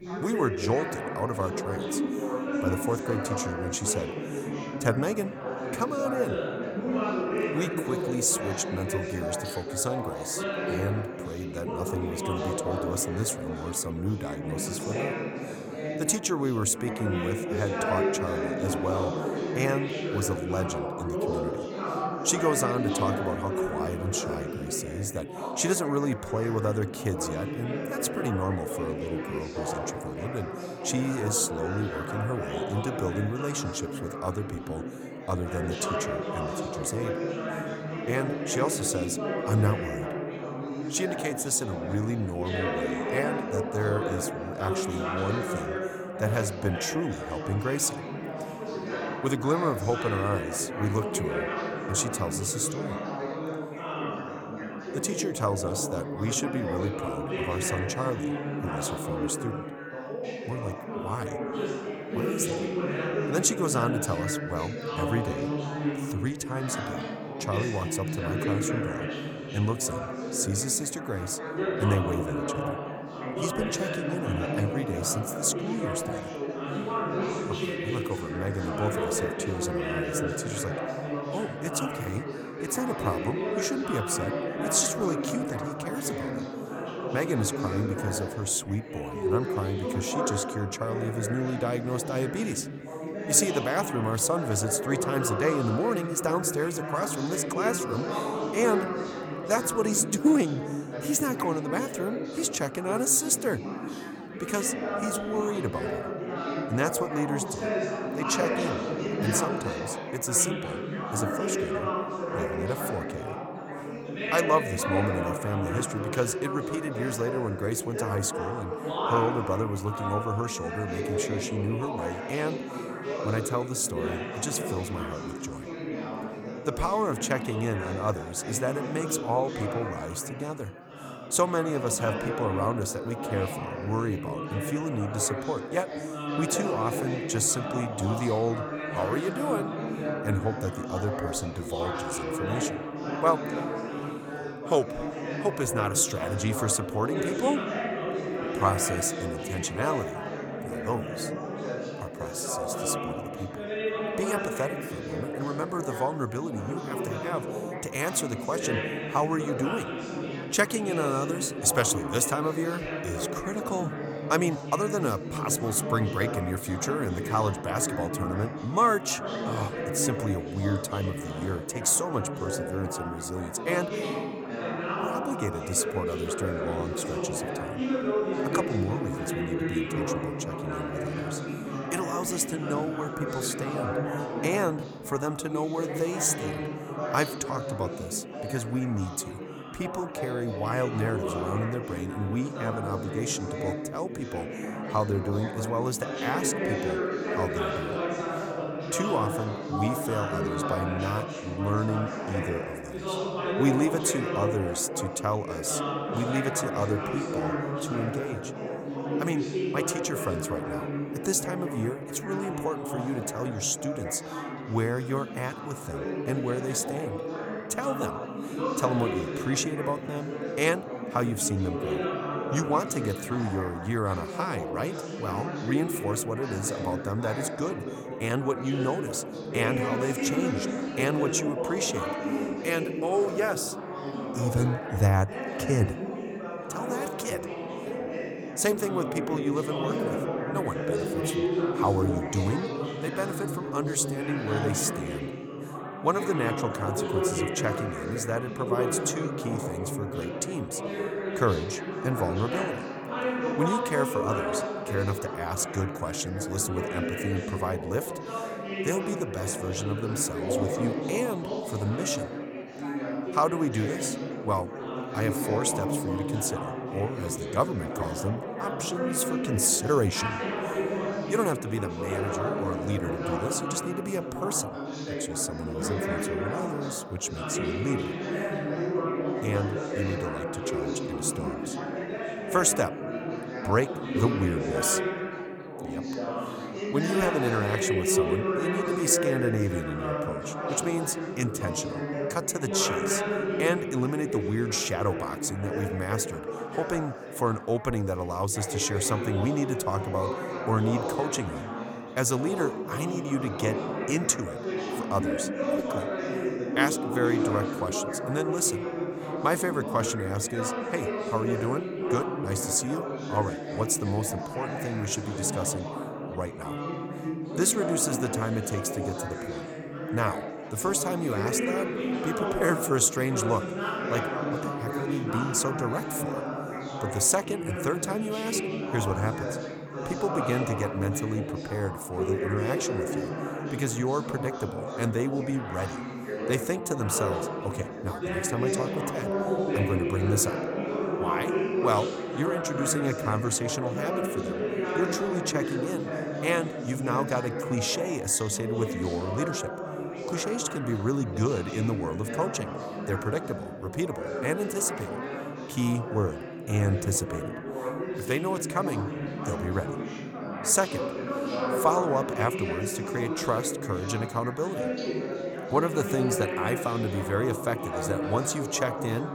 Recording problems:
chatter from many people; loud; throughout; 2 dB below the speech

